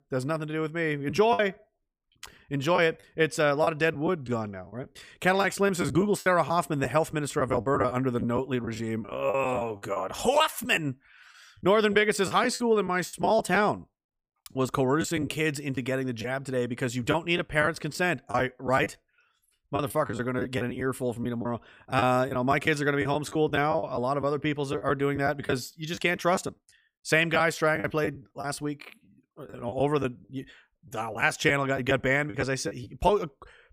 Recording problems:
choppy; very; 10% of the speech affected

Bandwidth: 15 kHz